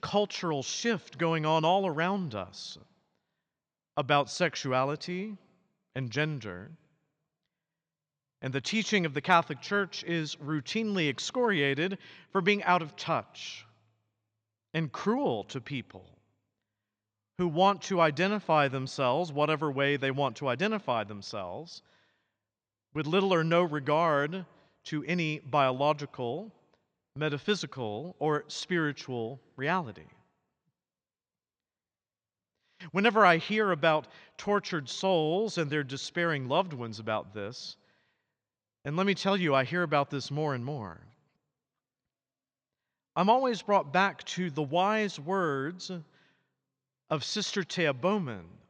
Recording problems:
none

